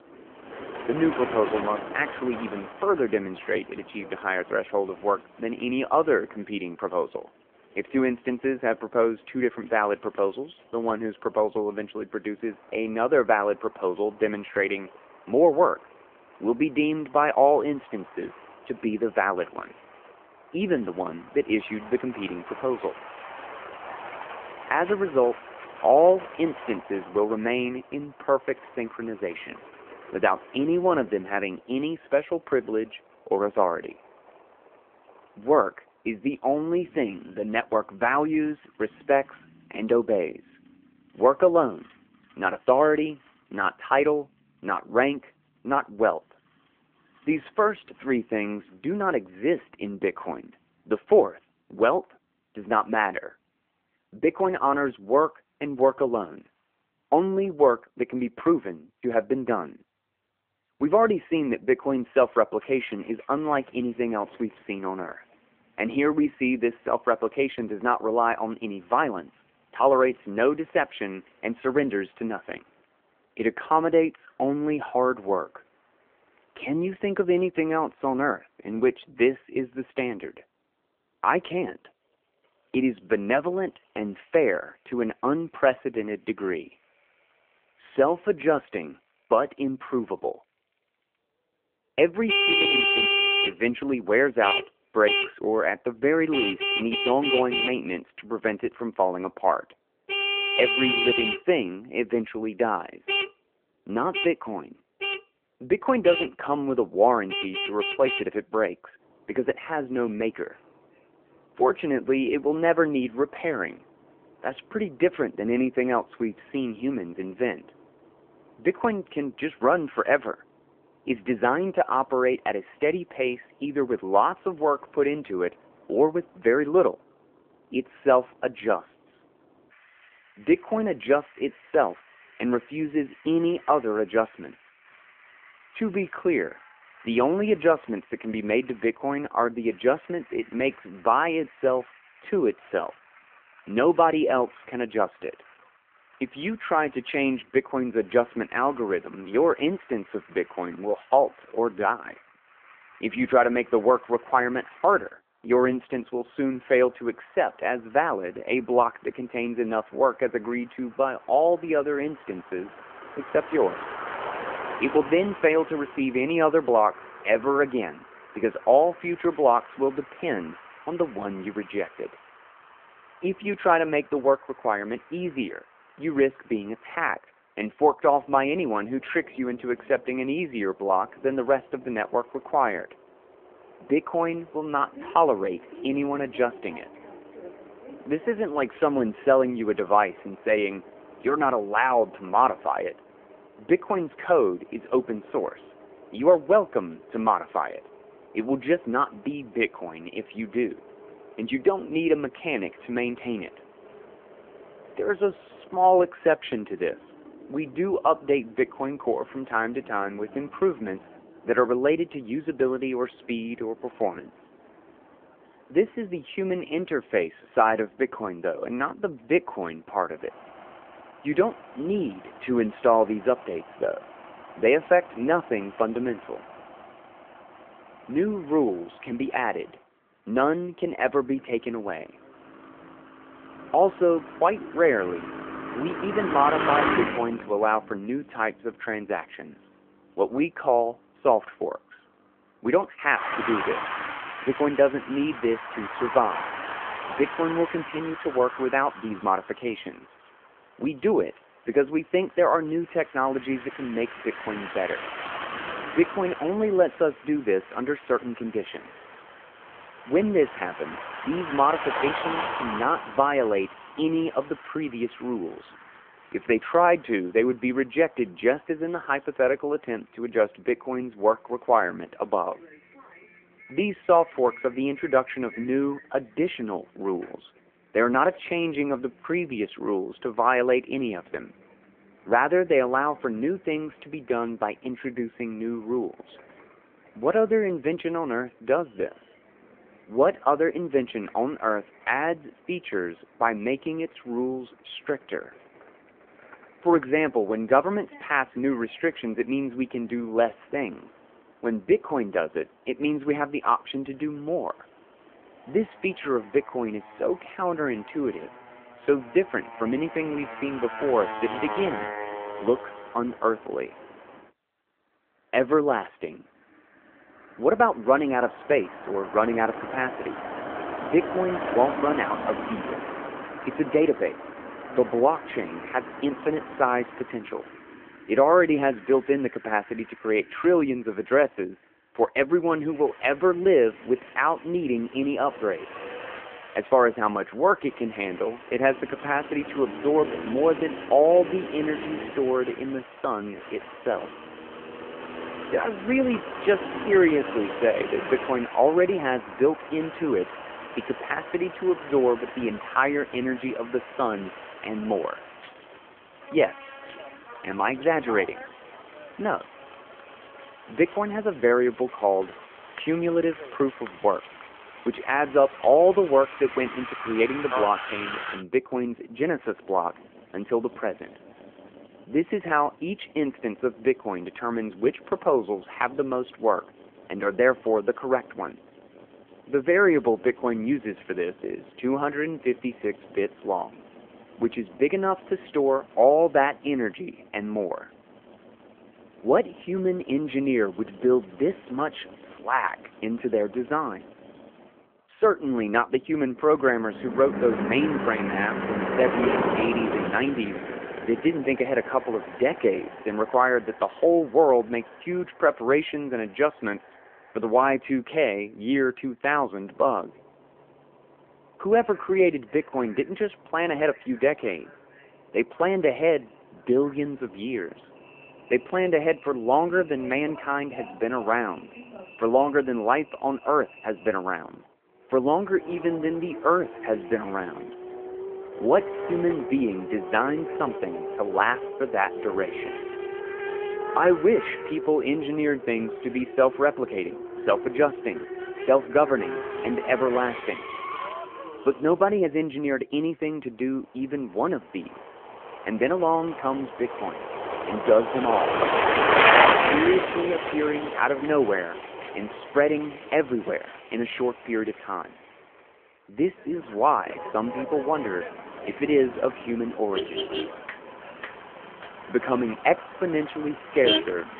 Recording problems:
phone-call audio
traffic noise; loud; throughout; 6 dB below the speech

